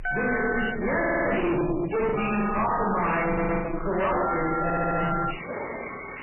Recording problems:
distortion; heavy; 48% of the sound clipped
off-mic speech; far
garbled, watery; badly; nothing above 3 kHz
room echo; noticeable; dies away in 1.1 s
alarms or sirens; loud; throughout; 5 dB below the speech
audio stuttering; at 1 s, at 3.5 s and at 4.5 s
choppy; occasionally; from 2 to 3.5 s; 5% of the speech affected

